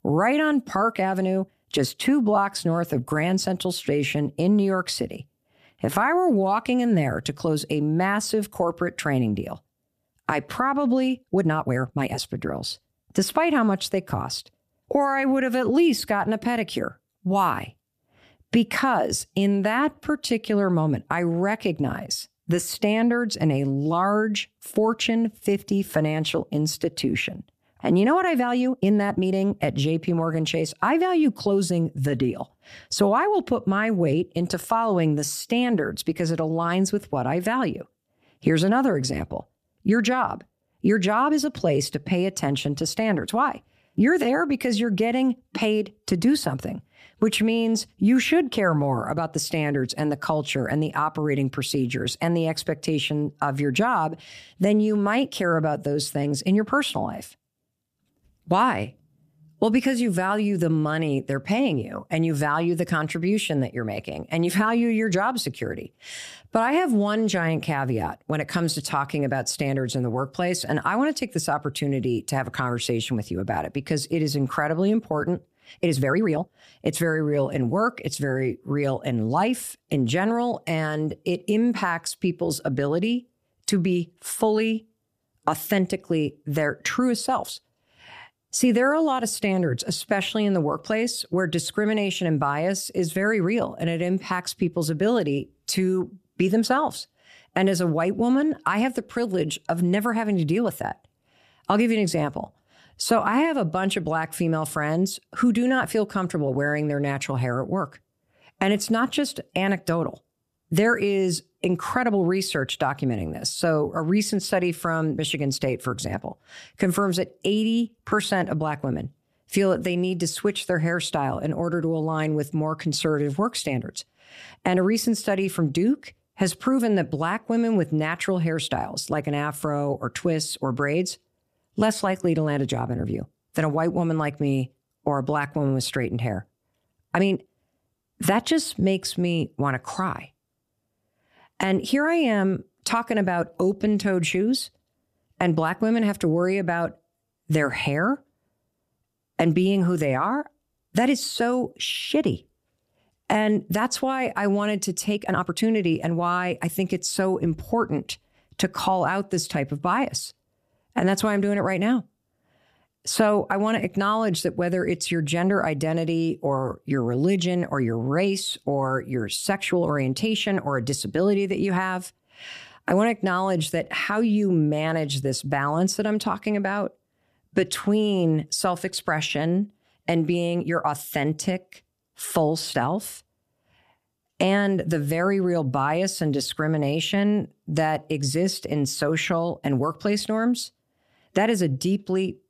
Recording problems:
uneven, jittery; strongly; from 1 s to 3:10

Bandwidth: 14.5 kHz